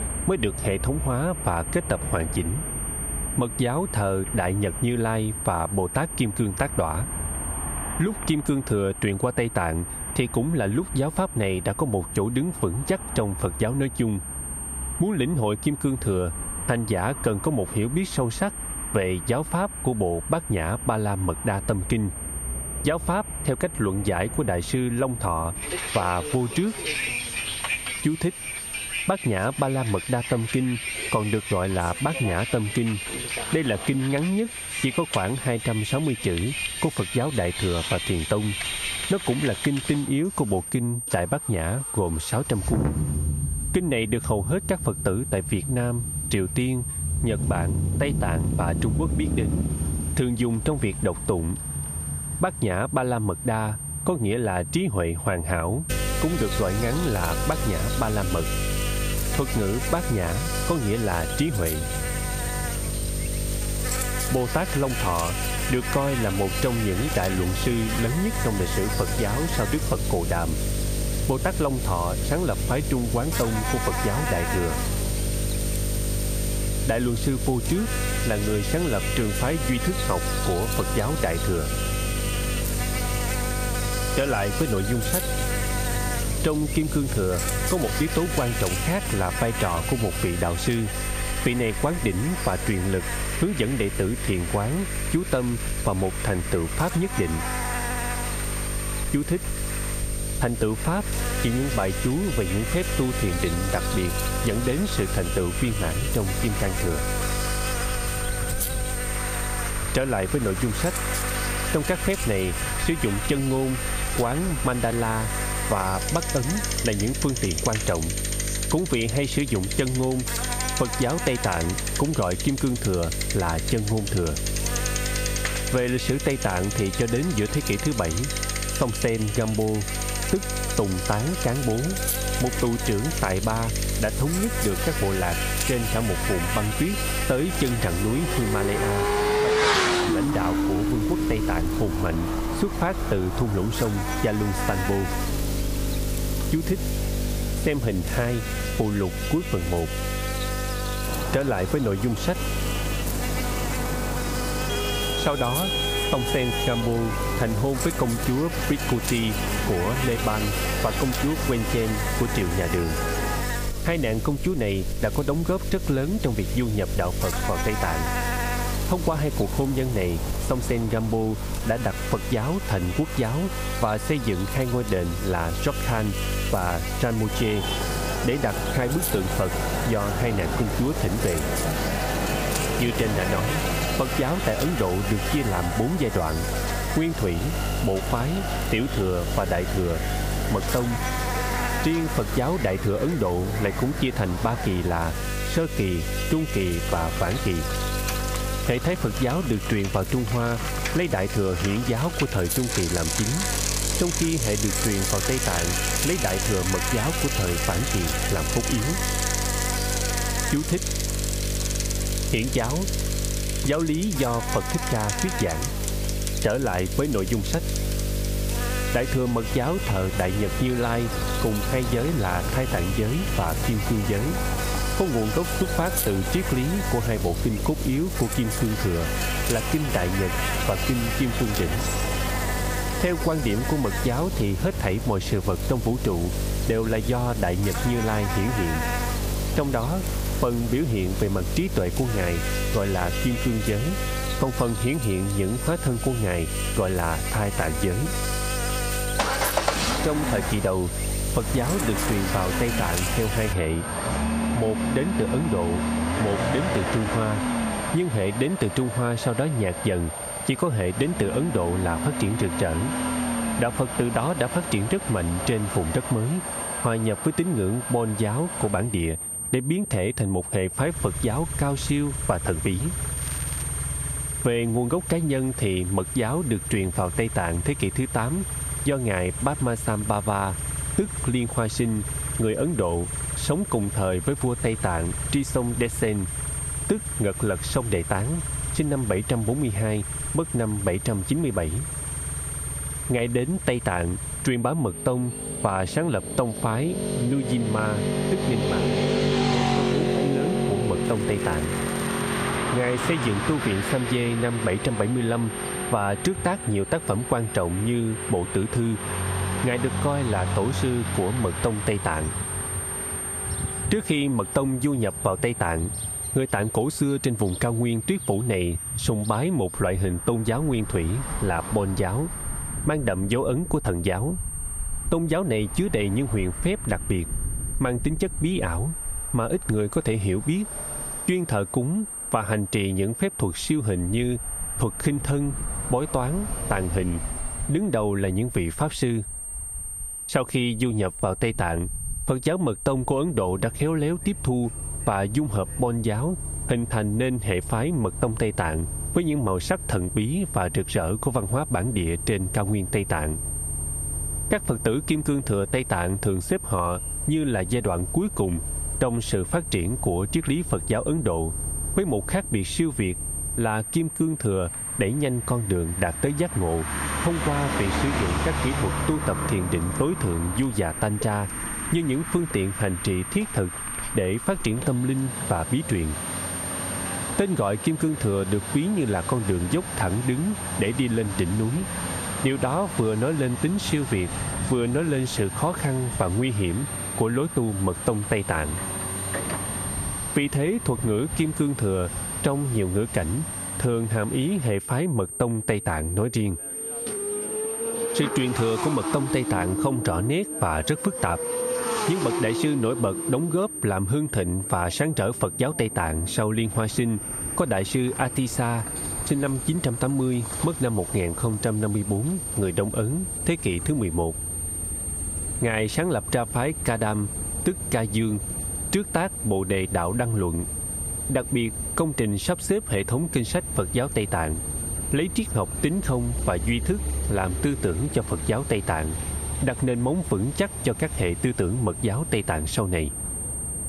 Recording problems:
squashed, flat; somewhat
electrical hum; loud; from 56 s to 4:14; 50 Hz, 3 dB below the speech
high-pitched whine; loud; until 2:20 and from 4:05 on; 9 kHz, 8 dB below the speech
traffic noise; loud; throughout; 7 dB below the speech
crackling; noticeable; 4 times, first at 1:35; 20 dB below the speech

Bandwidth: 15 kHz